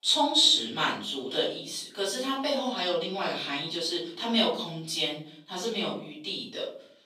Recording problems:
off-mic speech; far
room echo; noticeable; dies away in 0.5 s
thin; very slightly; fading below 400 Hz

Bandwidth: 15 kHz